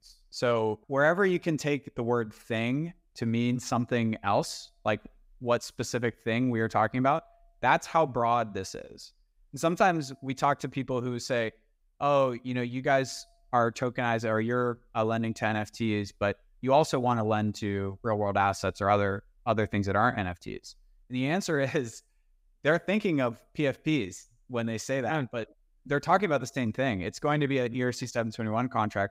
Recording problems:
none

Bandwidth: 15.5 kHz